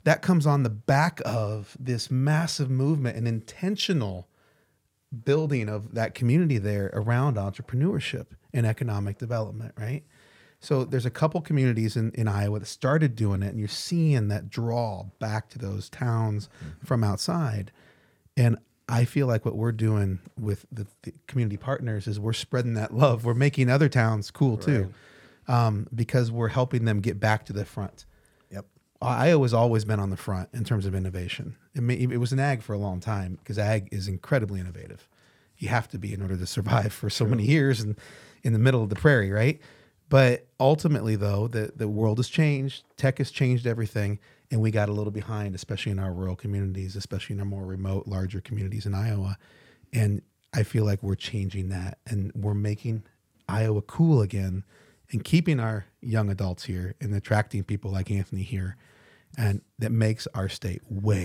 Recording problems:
abrupt cut into speech; at the end

